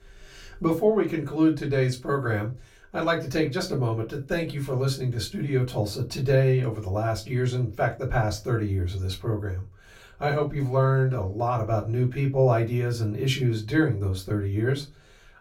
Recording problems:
off-mic speech; far
room echo; very slight; dies away in 0.2 s

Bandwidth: 16.5 kHz